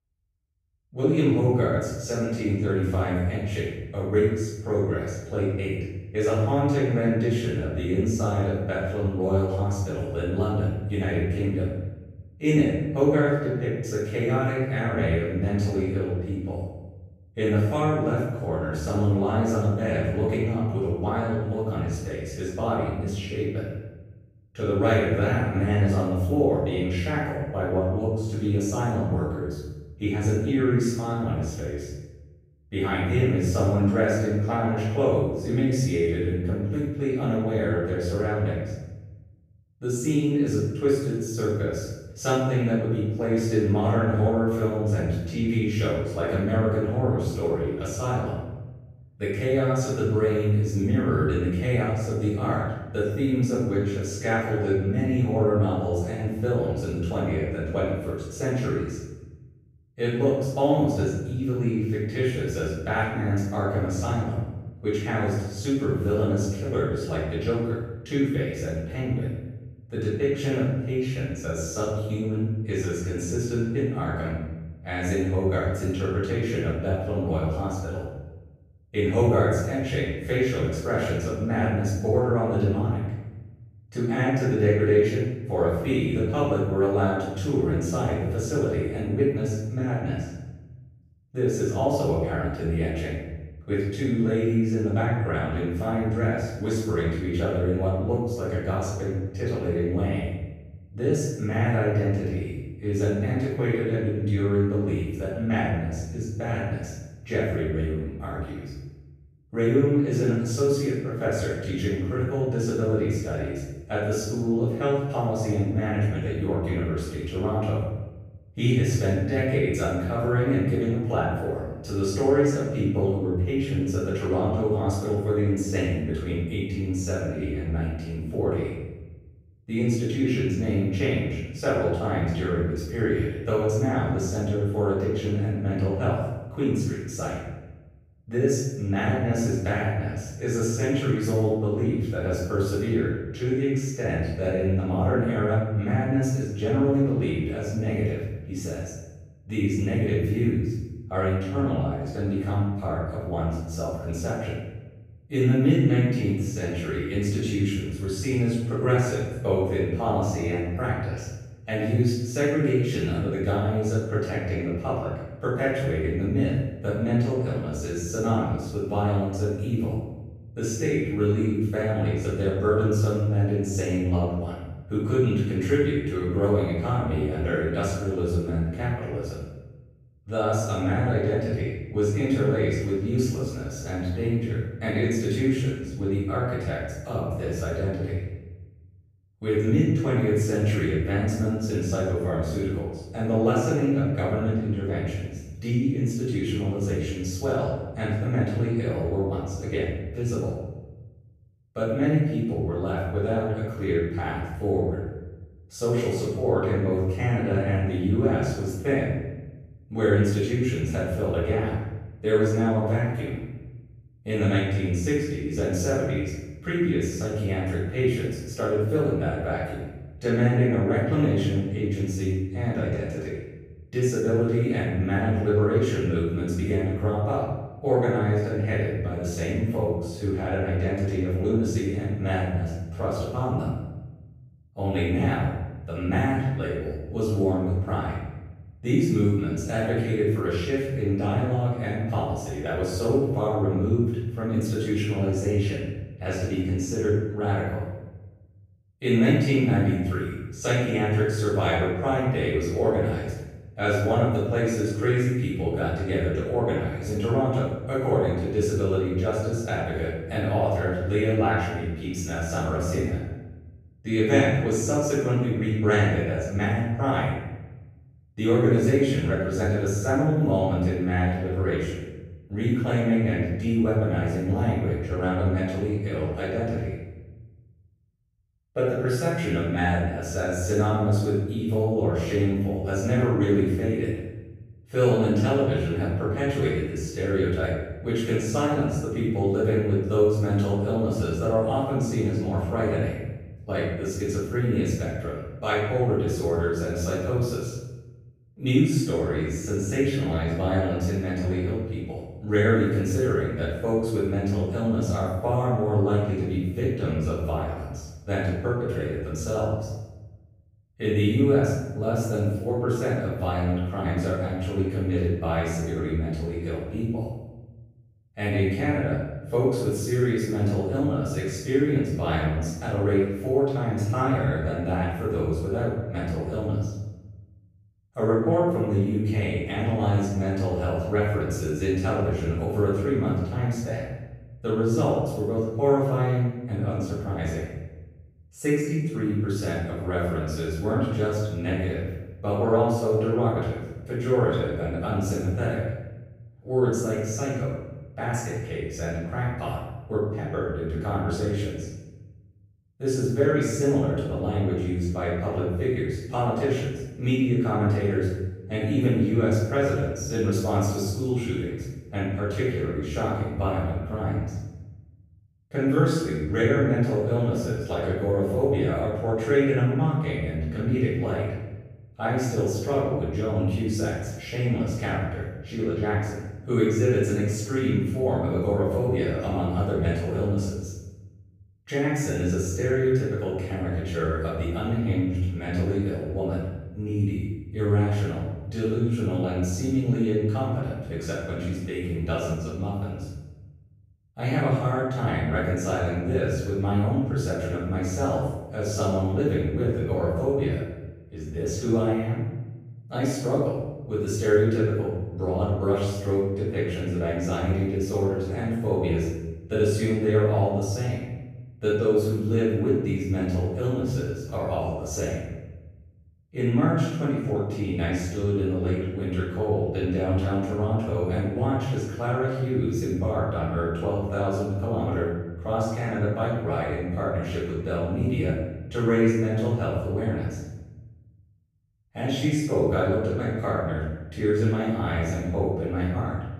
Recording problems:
room echo; strong; dies away in 1 s
off-mic speech; far

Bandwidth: 15 kHz